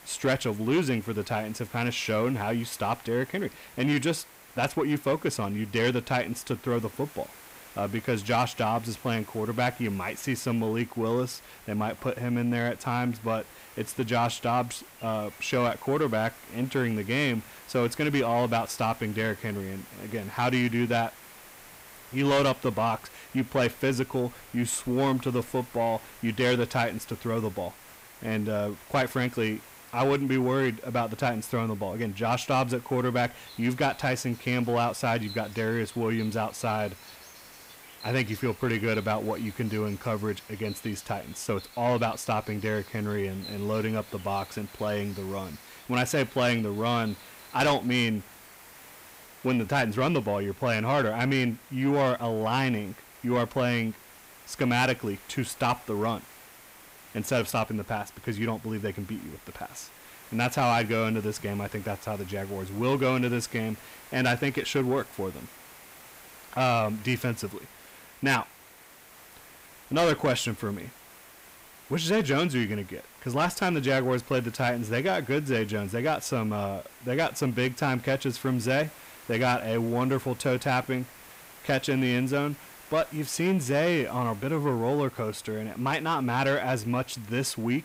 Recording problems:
distortion; slight; 10 dB below the speech
hiss; noticeable; throughout; 20 dB below the speech
animal sounds; faint; throughout; 25 dB below the speech

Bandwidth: 15.5 kHz